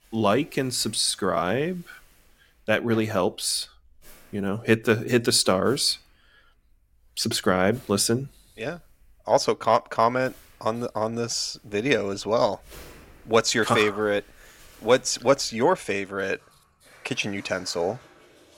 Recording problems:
household noises; faint; throughout; 30 dB below the speech

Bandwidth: 16.5 kHz